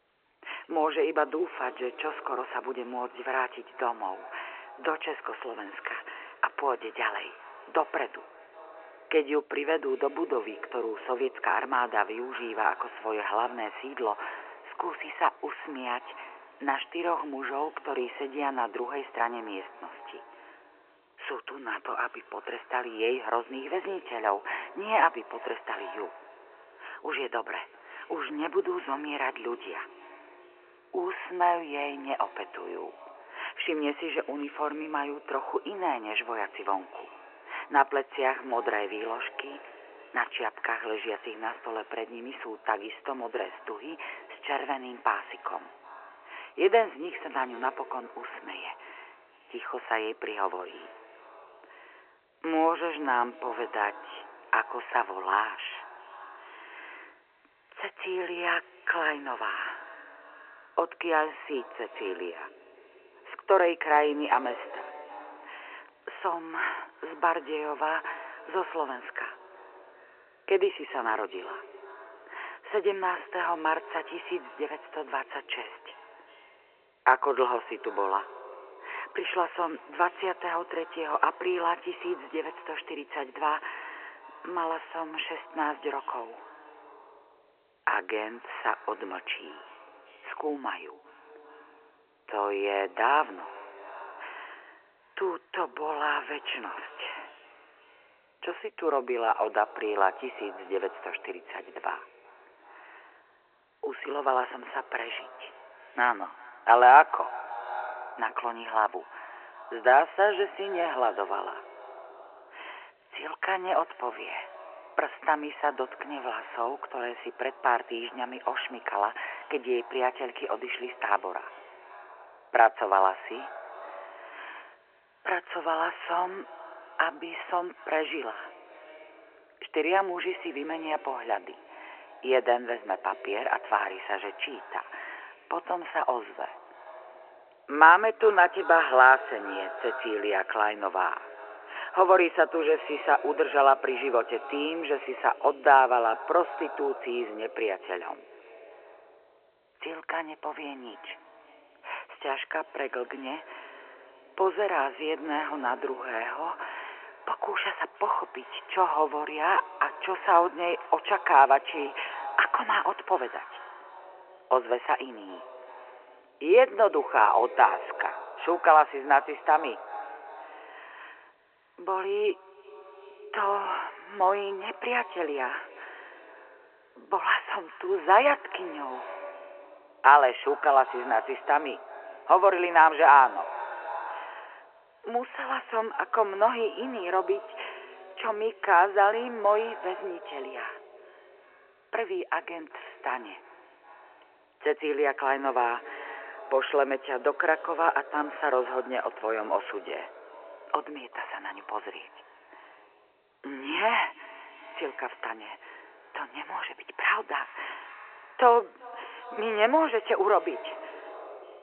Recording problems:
echo of what is said; noticeable; throughout; 380 ms later, 20 dB below the speech
phone-call audio

